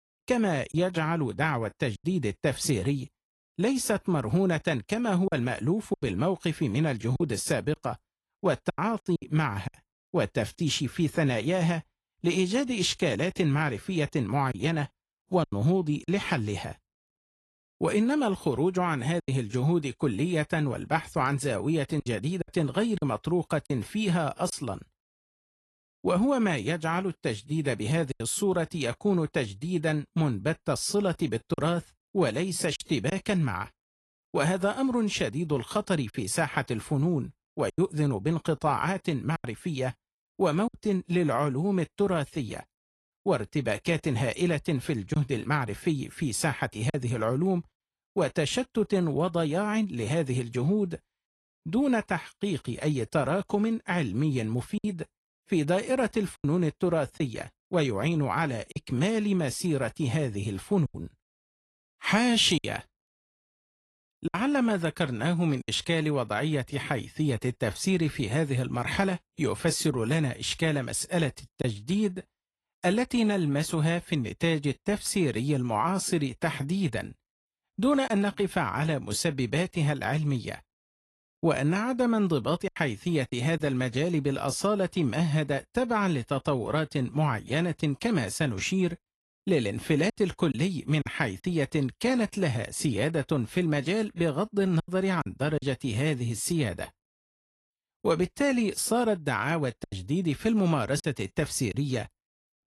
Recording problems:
garbled, watery; slightly; nothing above 11.5 kHz
choppy; occasionally; 3% of the speech affected

